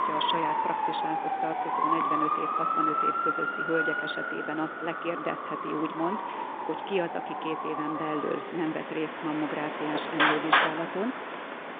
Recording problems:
phone-call audio; nothing above 3.5 kHz
traffic noise; very loud; throughout; 4 dB above the speech

